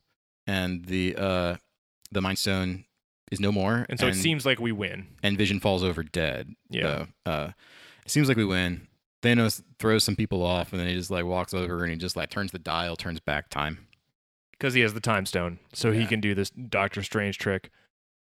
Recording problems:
uneven, jittery; strongly; from 2 to 17 s

